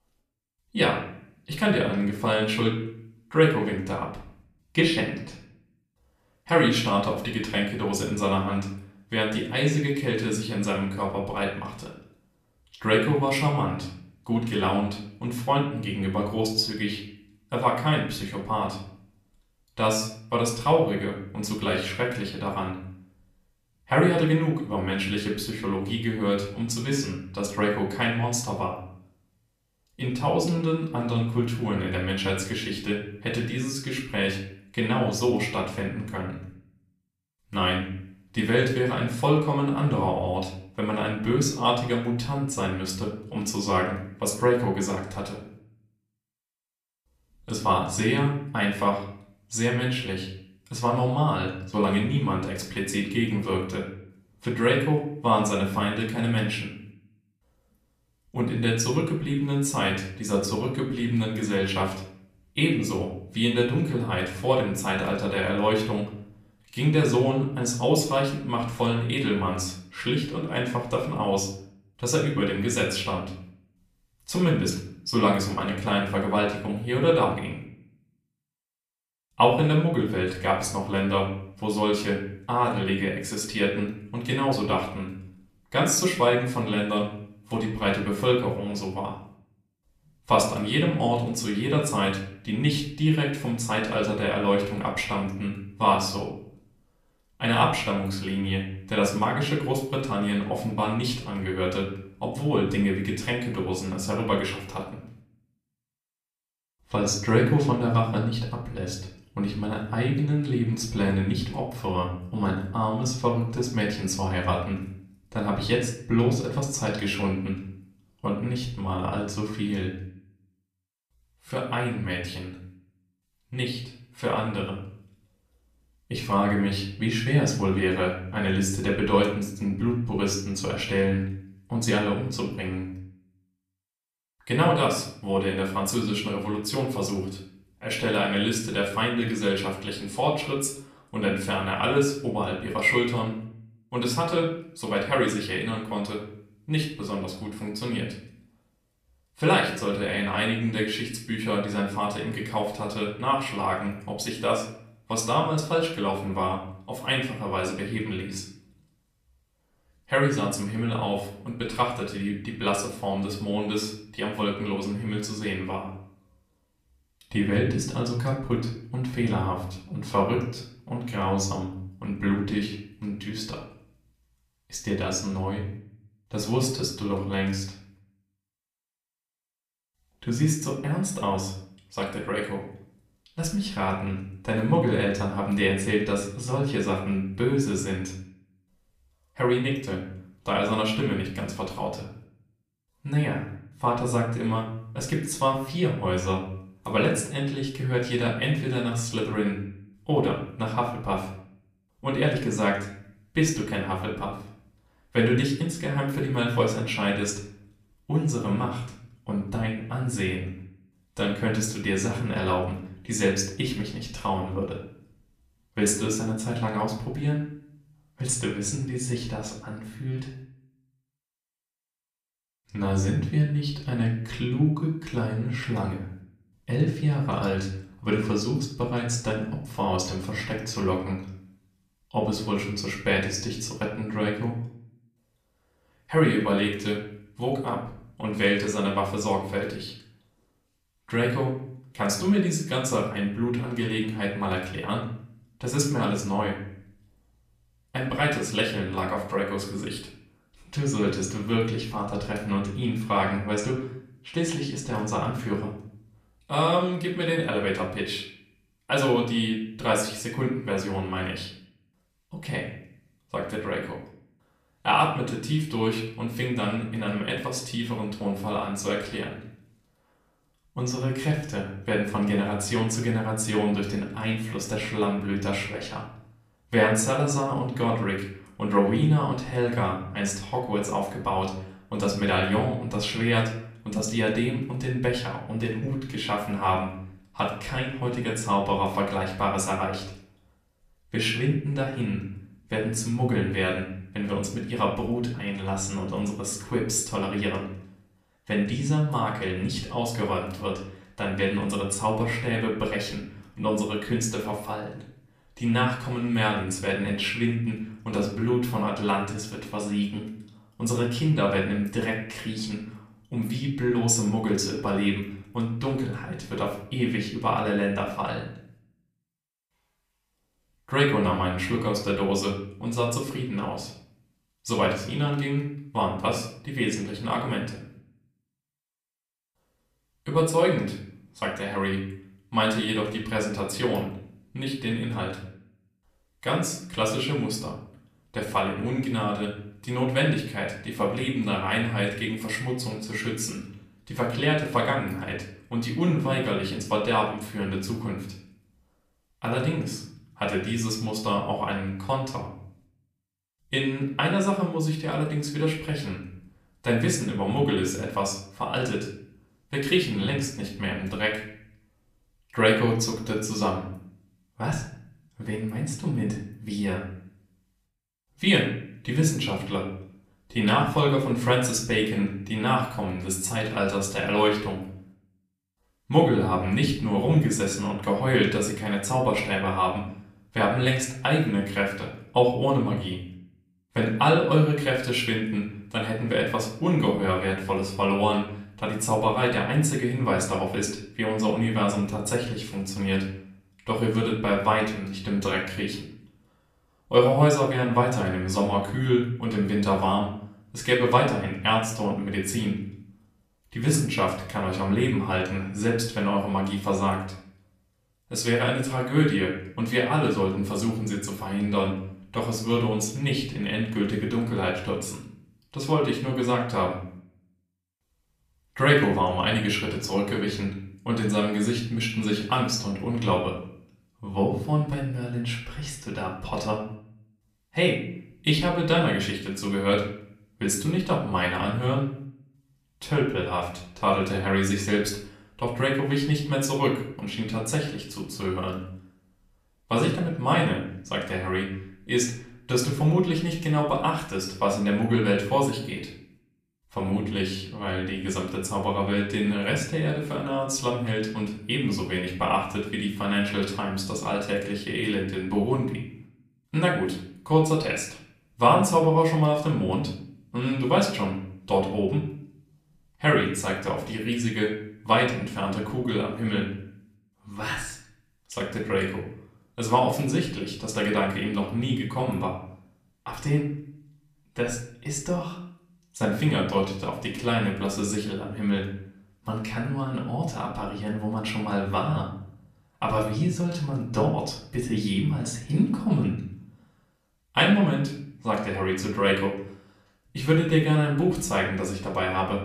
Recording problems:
off-mic speech; far
room echo; slight; dies away in 0.5 s

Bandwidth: 14.5 kHz